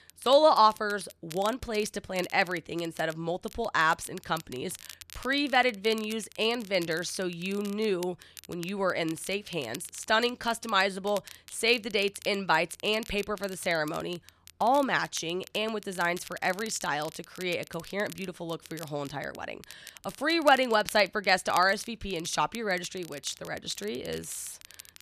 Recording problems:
crackle, like an old record; noticeable; 20 dB below the speech

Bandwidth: 14 kHz